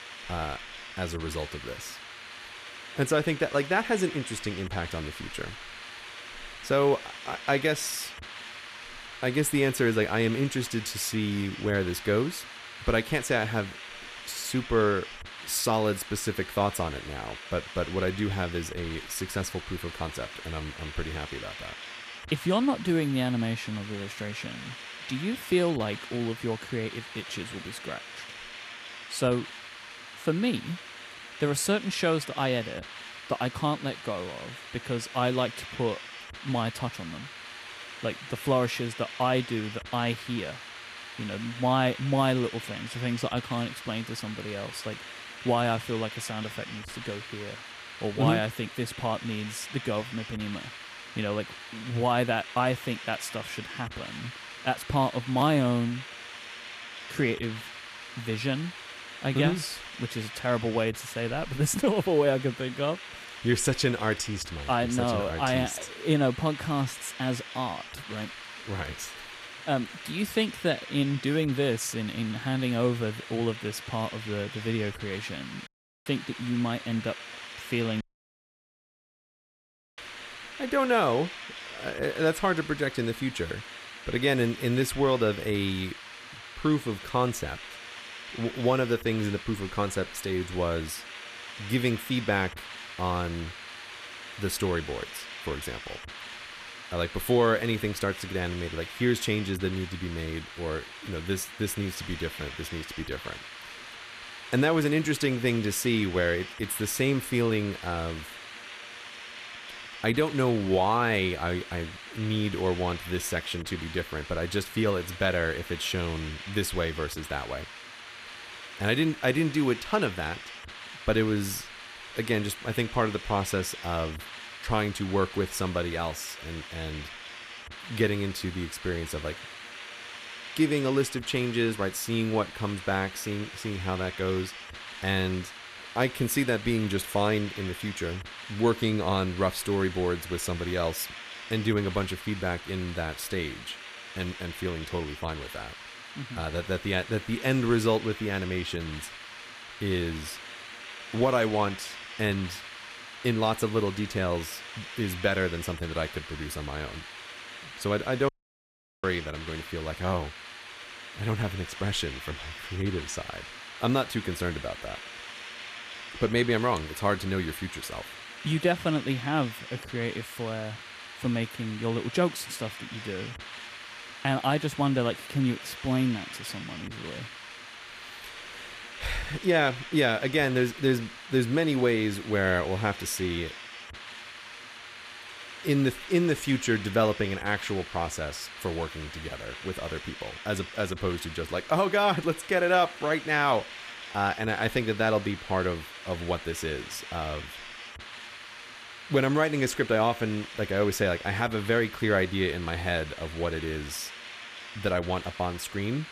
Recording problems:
hiss; noticeable; throughout; 10 dB below the speech
audio cutting out; at 1:16, at 1:18 for 2 s and at 2:38 for 0.5 s

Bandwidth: 14.5 kHz